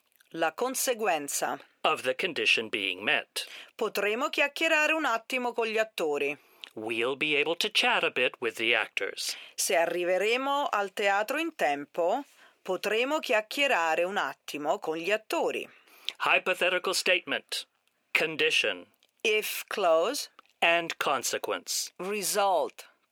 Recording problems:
thin; somewhat; fading below 450 Hz

